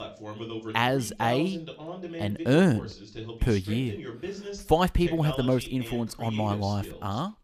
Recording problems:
voice in the background; noticeable; throughout; 10 dB below the speech

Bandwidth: 15 kHz